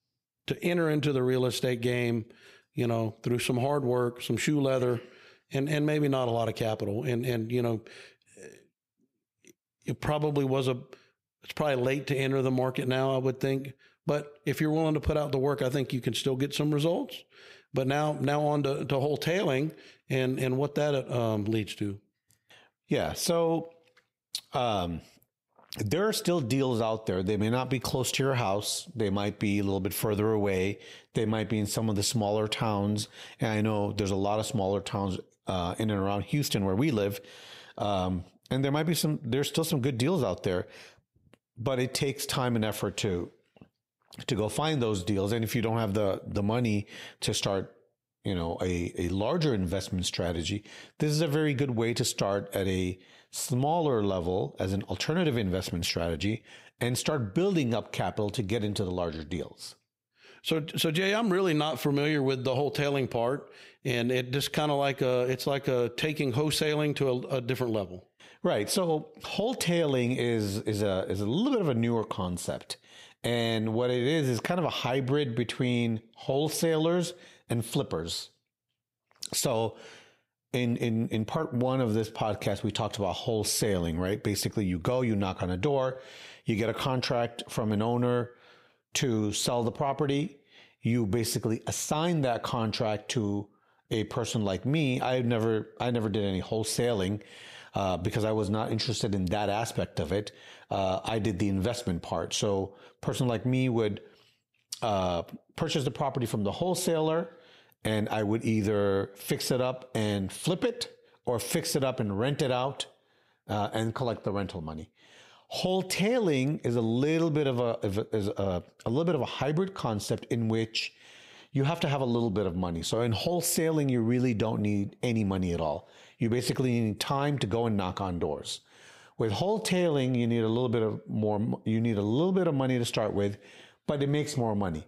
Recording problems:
squashed, flat; heavily

